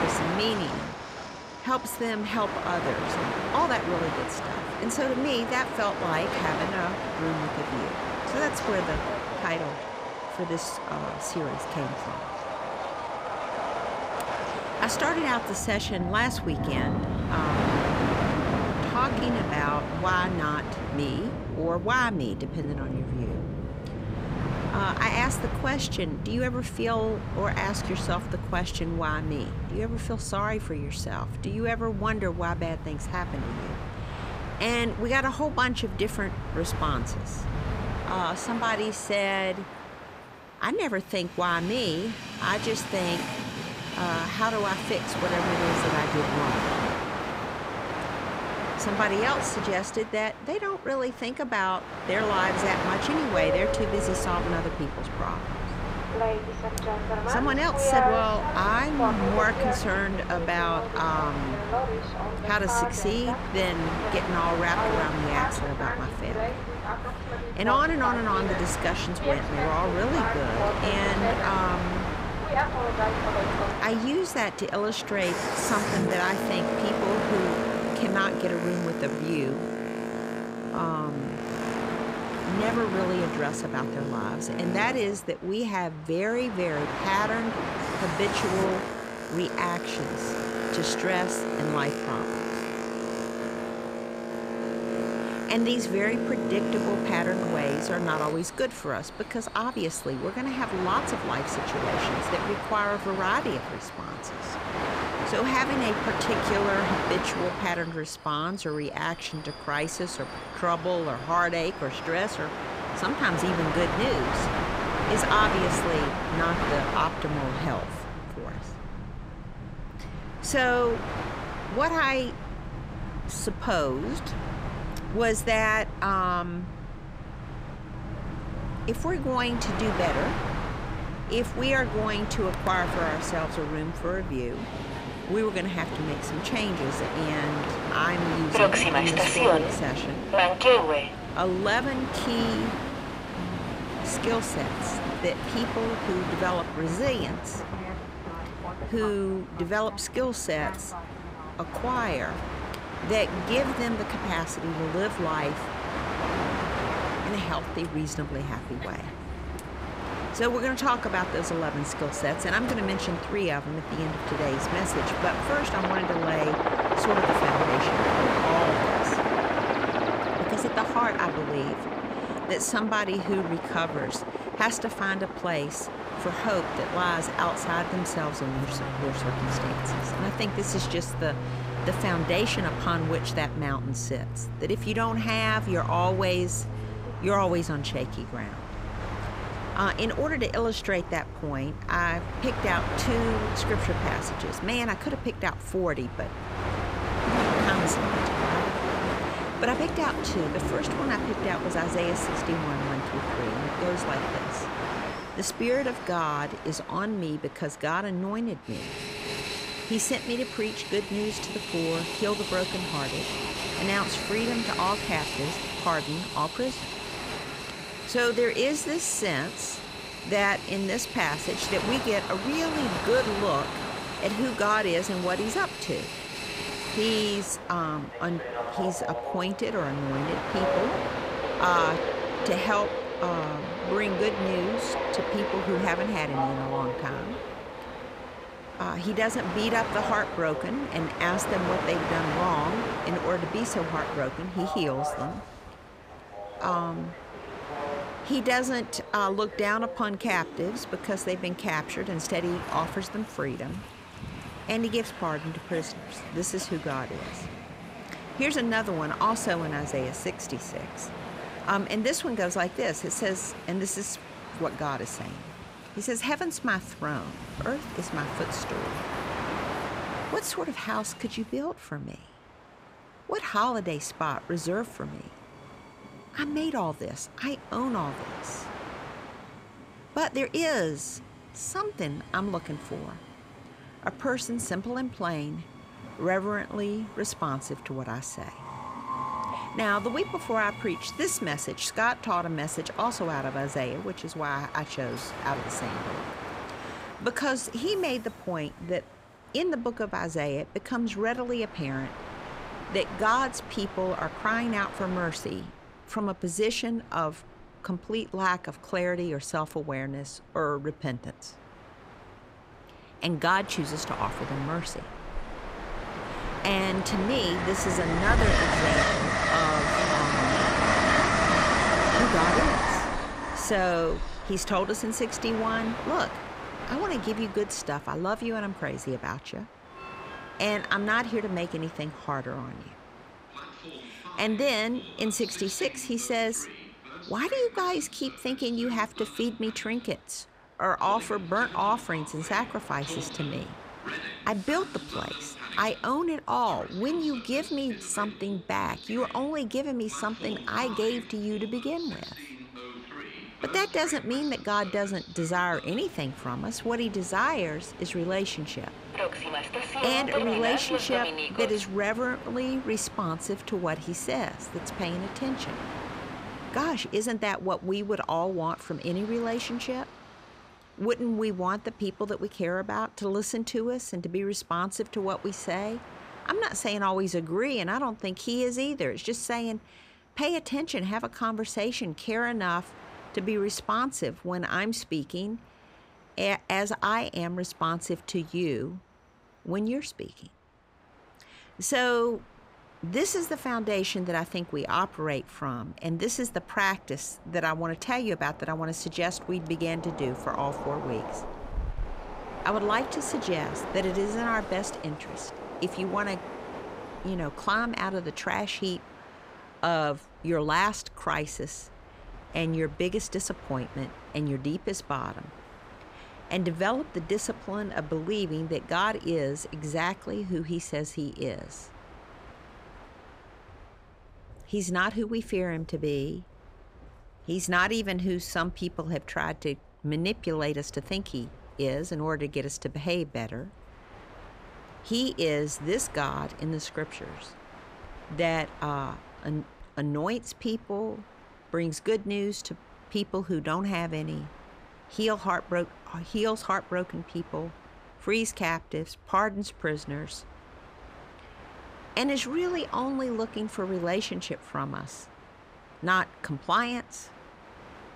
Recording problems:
train or aircraft noise; loud; throughout; 2 dB below the speech

